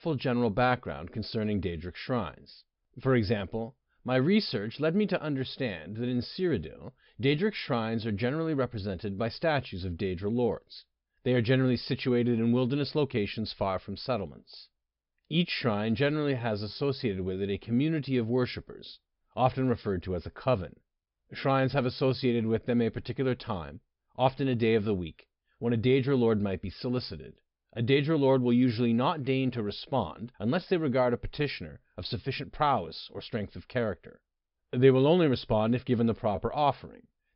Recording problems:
high frequencies cut off; noticeable; nothing above 5 kHz

